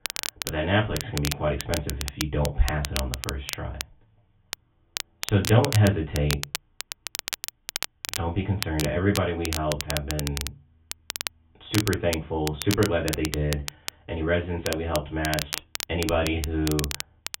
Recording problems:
off-mic speech; far
high frequencies cut off; severe; nothing above 3.5 kHz
room echo; very slight; dies away in 0.2 s
crackle, like an old record; loud; 6 dB below the speech

